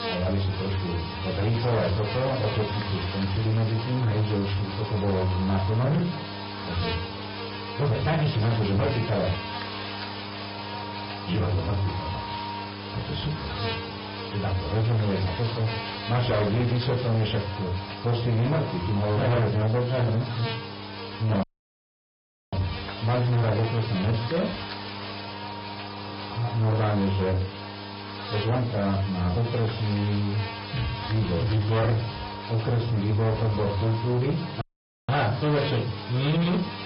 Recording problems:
distortion; heavy; 8 dB below the speech
off-mic speech; far
room echo; very slight; dies away in 0.3 s
garbled, watery; slightly; nothing above 5 kHz
high frequencies cut off; slight
electrical hum; loud; throughout; 50 Hz, 3 dB below the speech
audio cutting out; at 21 s for 1 s and at 35 s

